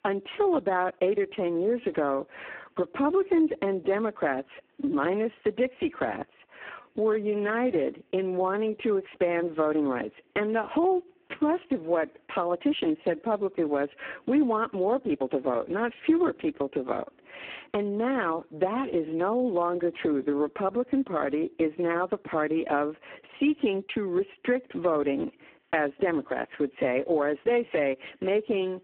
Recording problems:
phone-call audio; poor line
squashed, flat; somewhat

